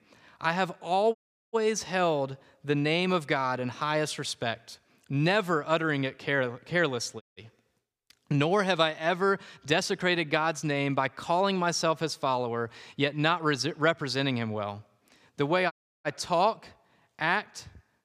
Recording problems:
audio cutting out; at 1 s, at 7 s and at 16 s

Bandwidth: 15 kHz